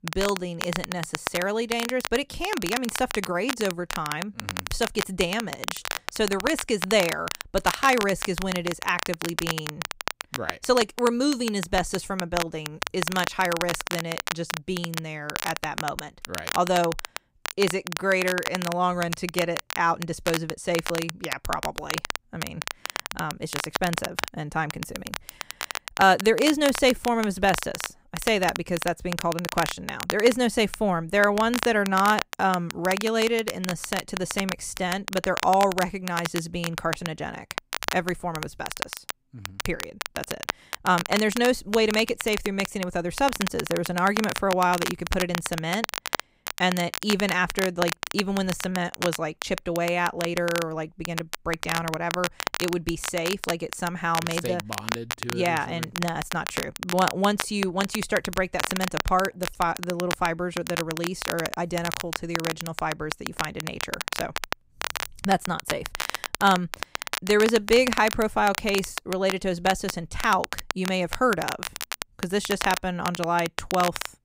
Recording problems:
crackle, like an old record; loud; 6 dB below the speech

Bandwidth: 15.5 kHz